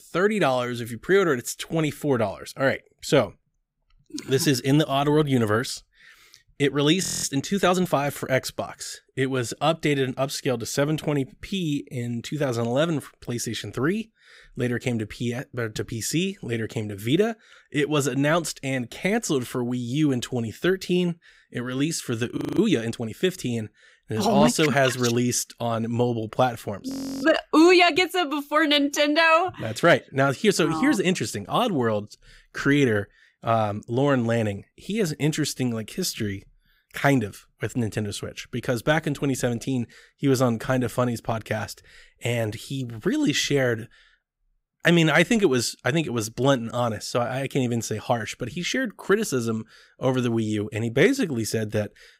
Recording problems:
audio freezing; at 7 s, at 22 s and at 27 s

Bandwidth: 15.5 kHz